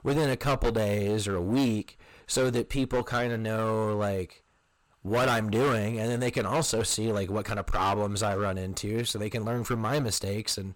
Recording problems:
distortion; heavy; 14% of the sound clipped

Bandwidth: 17 kHz